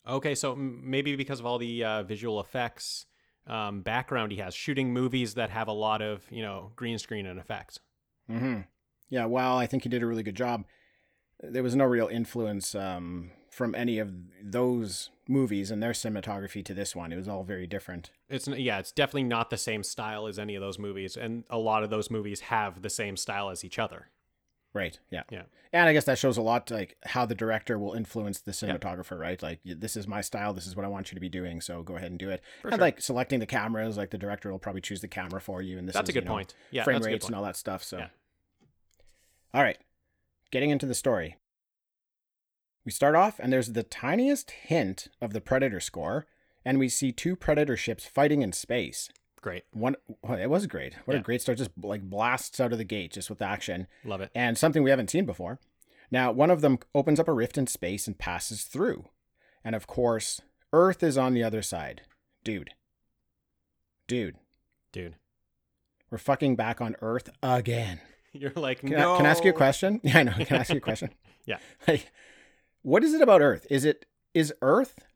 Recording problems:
none

